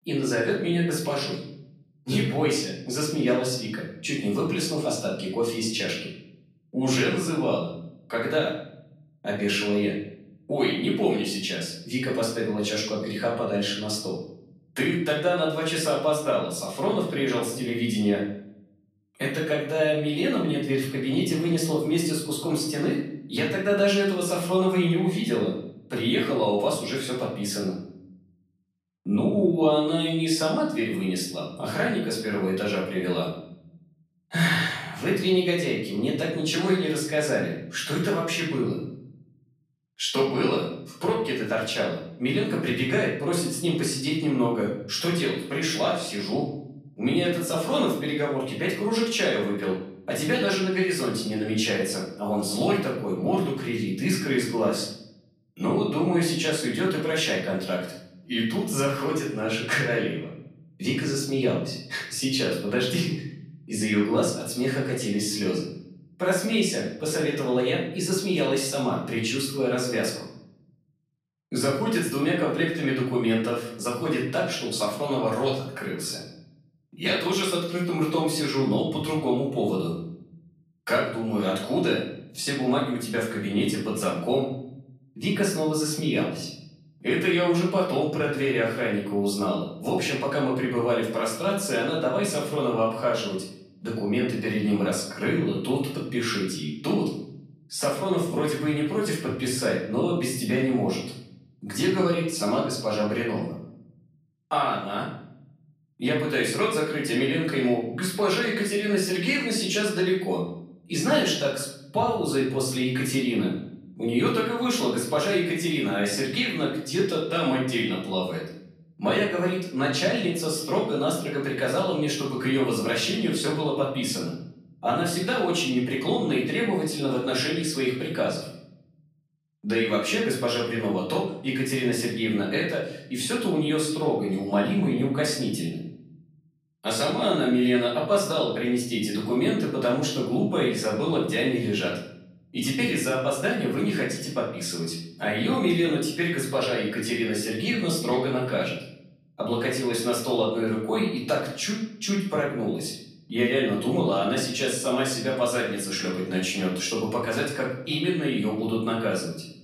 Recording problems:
off-mic speech; far
room echo; noticeable; dies away in 0.7 s

